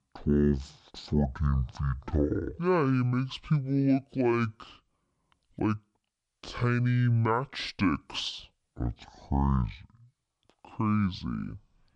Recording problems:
wrong speed and pitch; too slow and too low; 0.5 times normal speed

